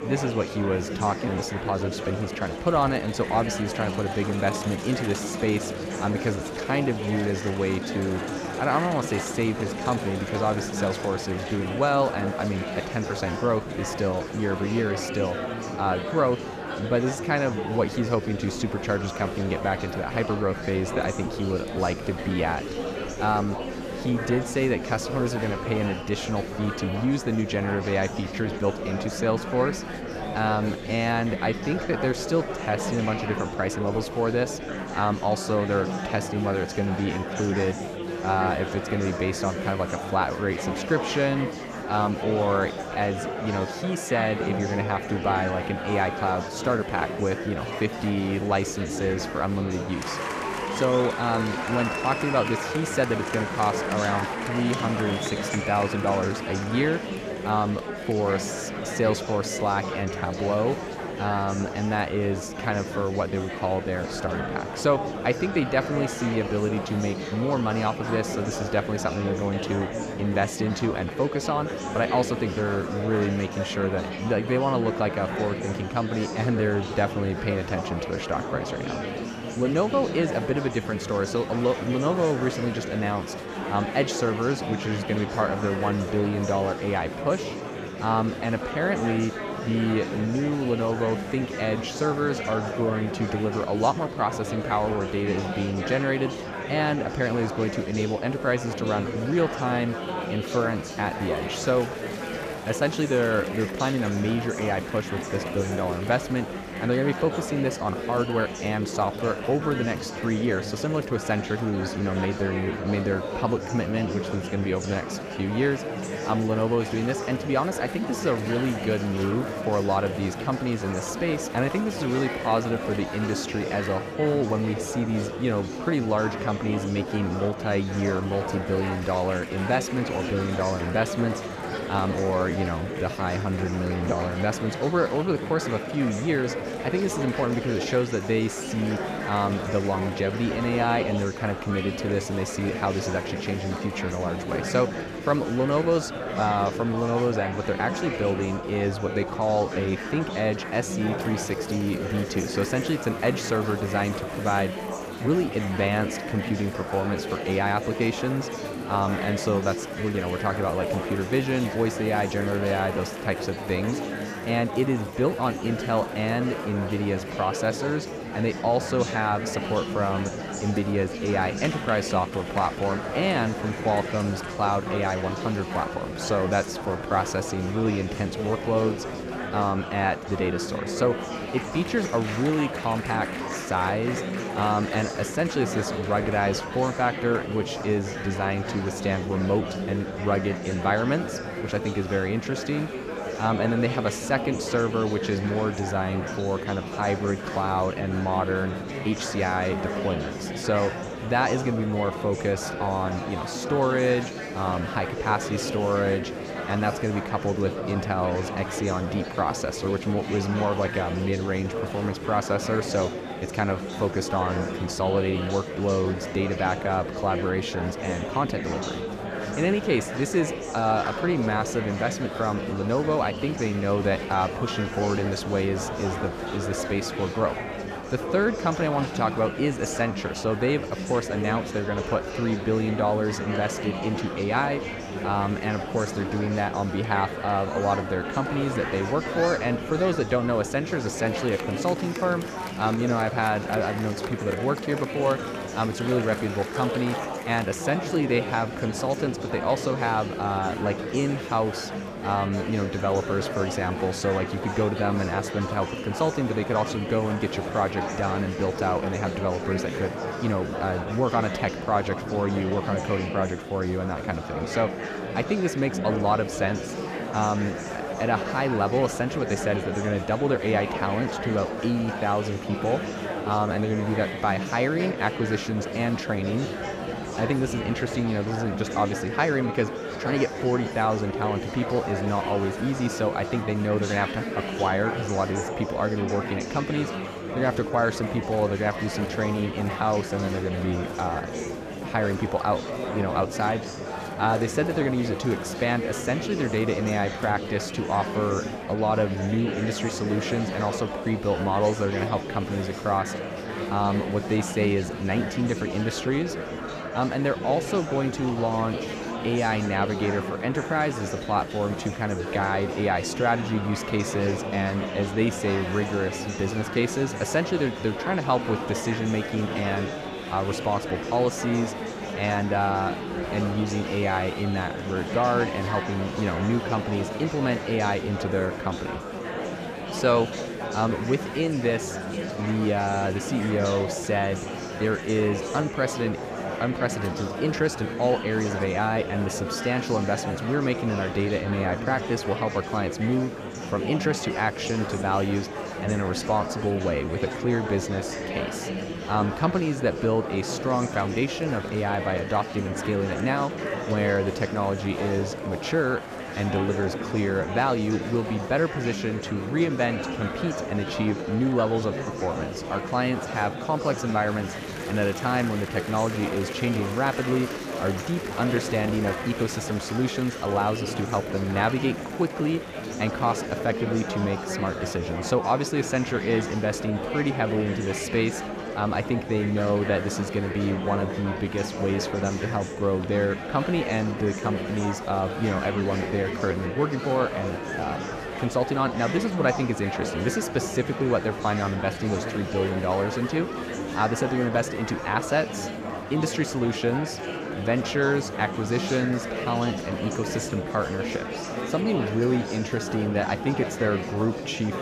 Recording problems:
murmuring crowd; loud; throughout; 5 dB below the speech

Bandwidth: 14.5 kHz